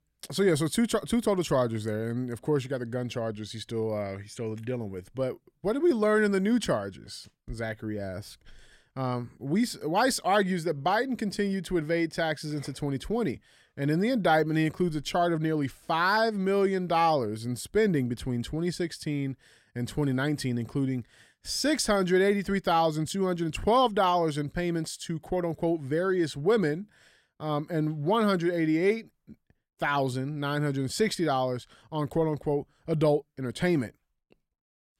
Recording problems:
none

